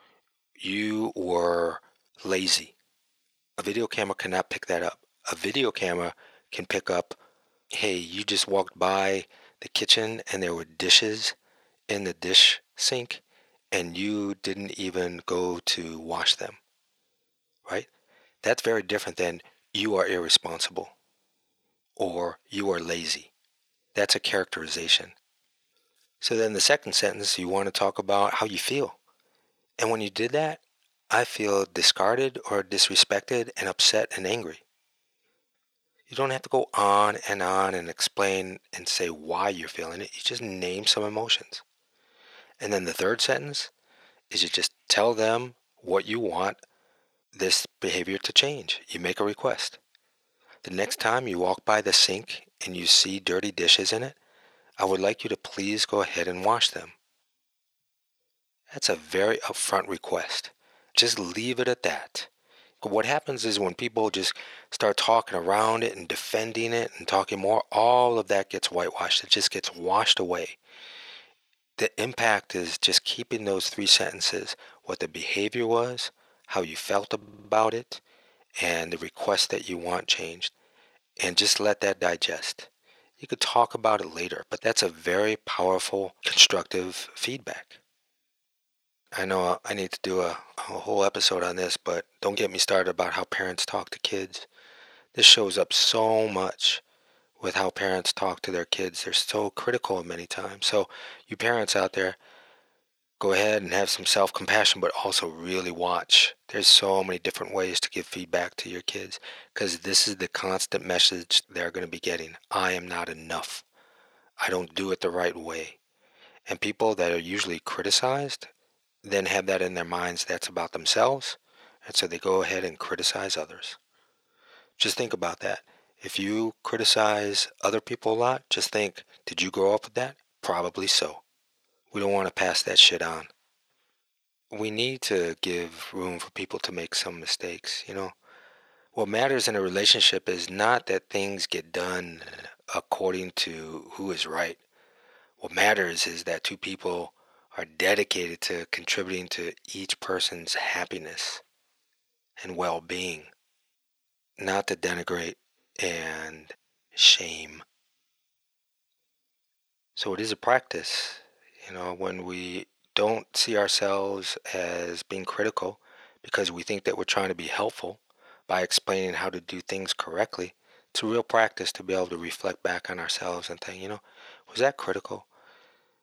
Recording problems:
thin; very; fading below 600 Hz
audio stuttering; at 1:17 and at 2:22

